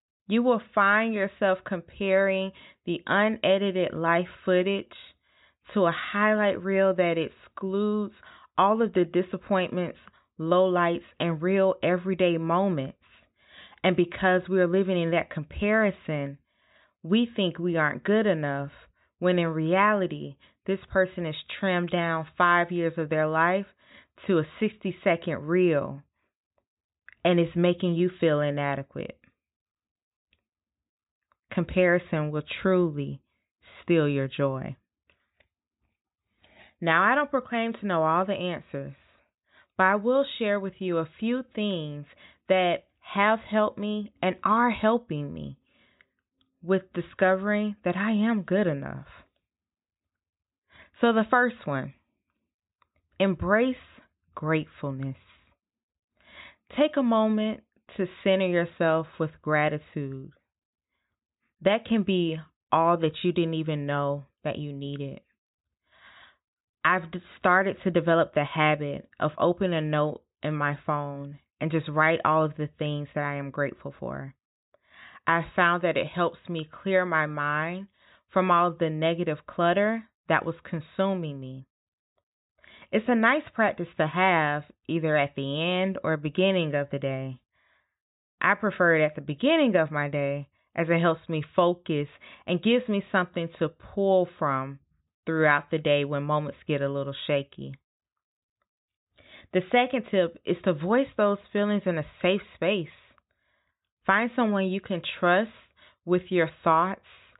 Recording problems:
high frequencies cut off; severe; nothing above 4 kHz

